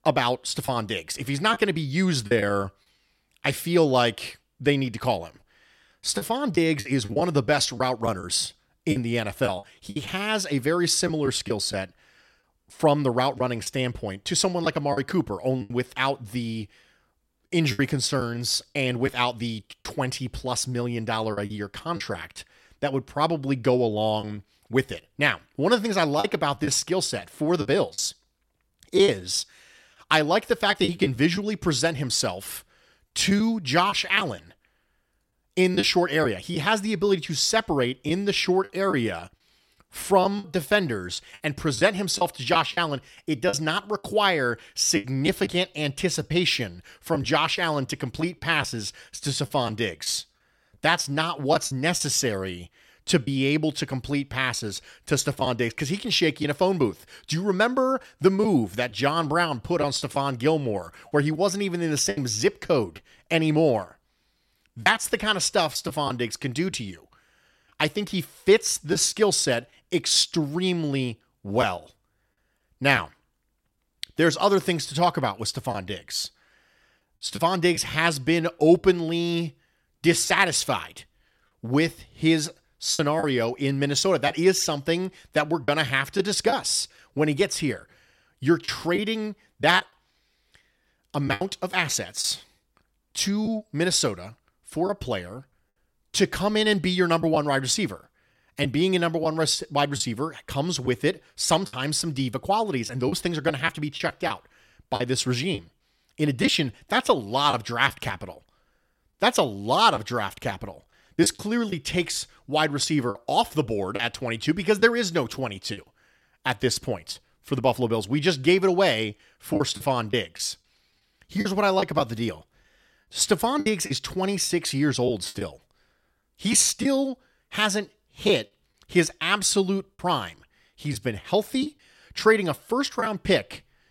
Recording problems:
choppy; occasionally; 4% of the speech affected

